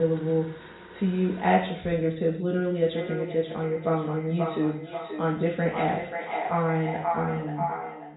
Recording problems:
echo of what is said; strong; from 3 s on; 530 ms later, 6 dB below the speech
off-mic speech; far
high frequencies cut off; severe; nothing above 4 kHz
room echo; slight; dies away in 0.5 s
household noises; noticeable; until 2 s; 20 dB below the speech
abrupt cut into speech; at the start

